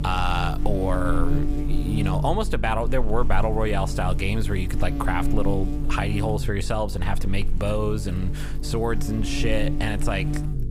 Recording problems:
electrical hum; loud; throughout; 50 Hz, 9 dB below the speech

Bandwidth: 15.5 kHz